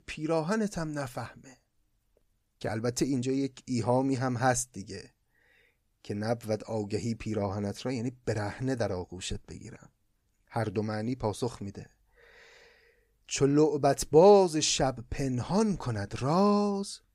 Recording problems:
none

